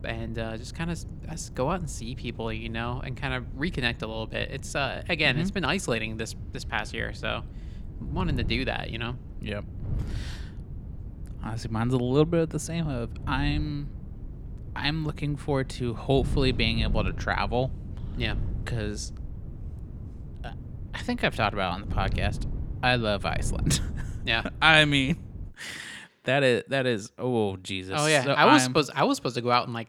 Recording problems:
wind noise on the microphone; occasional gusts; until 26 s; 20 dB below the speech

